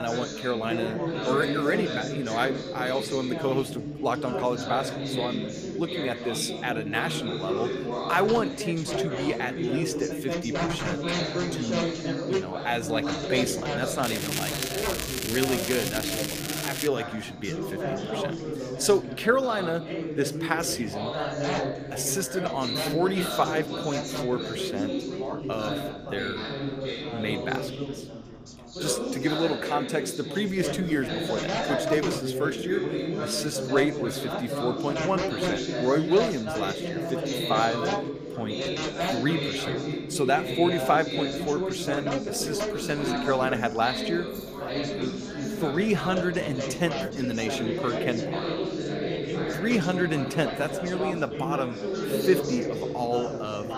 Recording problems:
chatter from many people; loud; throughout; 2 dB below the speech
crackling; loud; from 14 to 17 s; 2 dB below the speech
abrupt cut into speech; at the start
jangling keys; faint; at 44 s; peak 20 dB below the speech

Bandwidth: 15 kHz